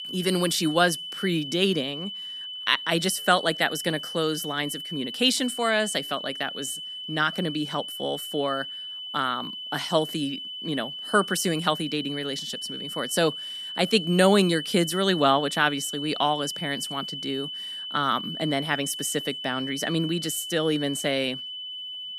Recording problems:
high-pitched whine; loud; throughout; 3 kHz, 7 dB below the speech

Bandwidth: 14.5 kHz